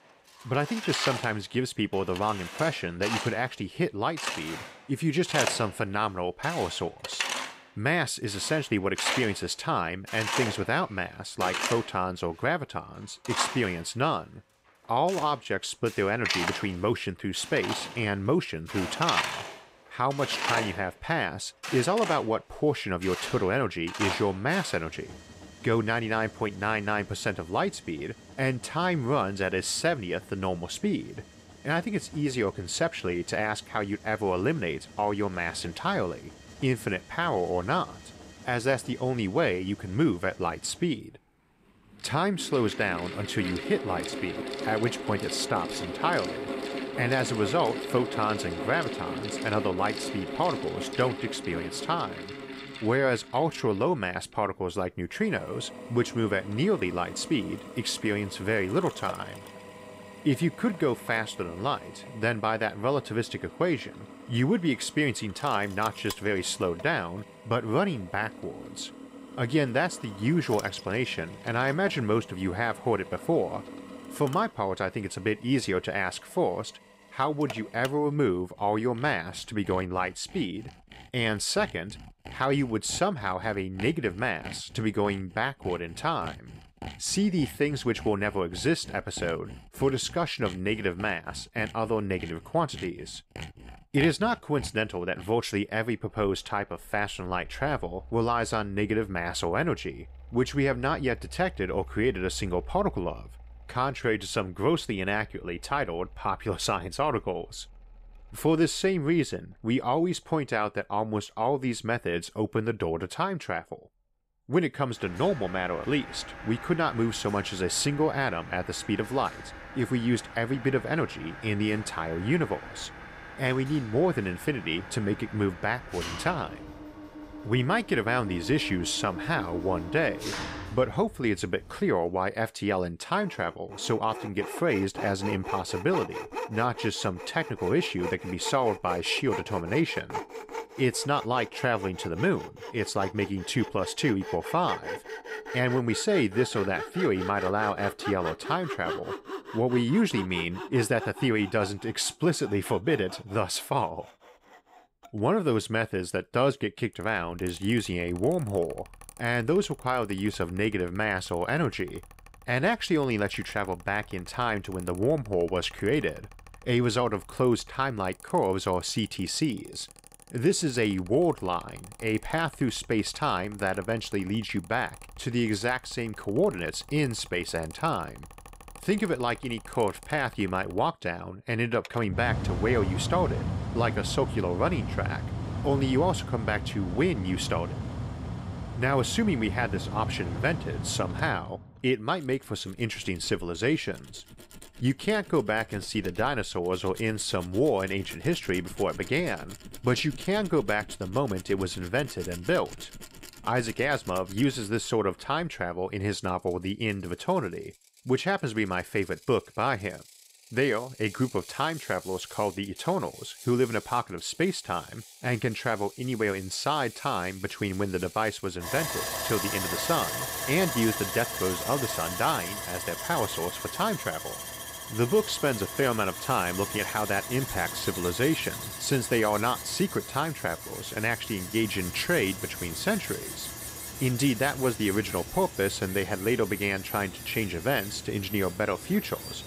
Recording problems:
machinery noise; loud; throughout; 9 dB below the speech

